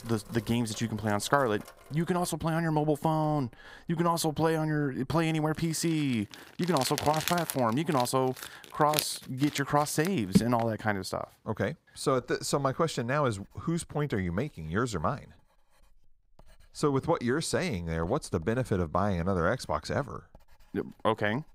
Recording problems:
household noises; loud; throughout; 8 dB below the speech

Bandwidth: 15.5 kHz